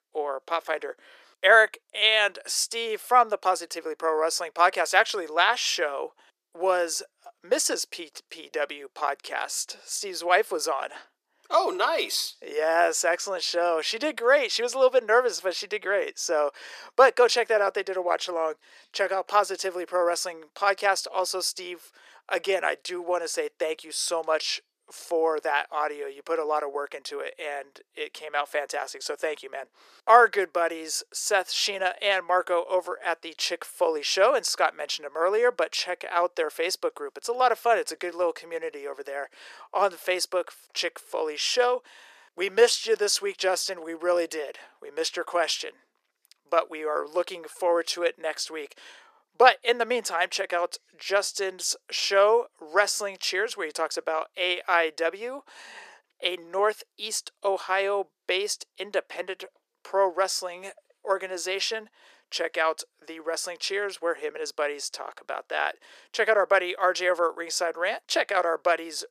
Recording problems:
thin; very; fading below 400 Hz

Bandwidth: 14.5 kHz